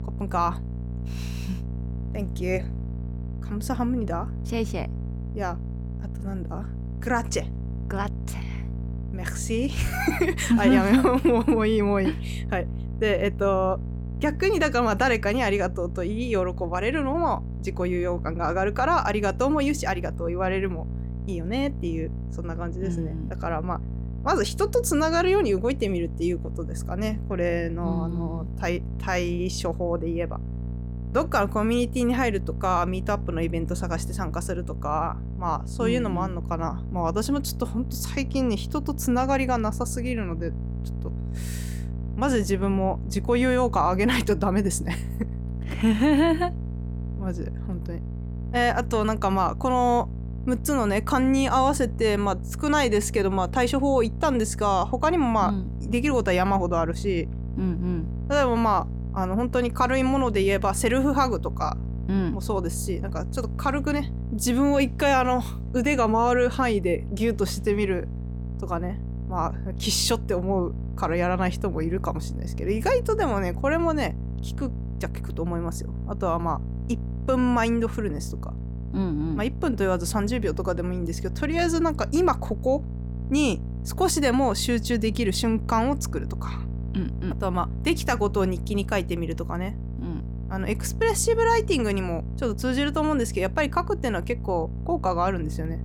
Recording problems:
electrical hum; noticeable; throughout; 60 Hz, 20 dB below the speech

